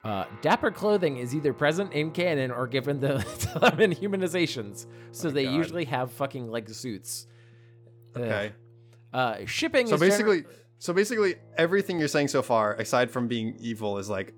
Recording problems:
background music; faint; throughout; 20 dB below the speech

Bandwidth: 18.5 kHz